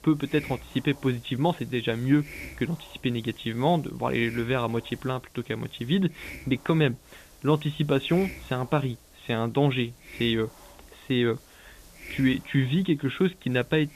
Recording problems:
high frequencies cut off; severe; nothing above 4 kHz
hiss; noticeable; throughout; 20 dB below the speech

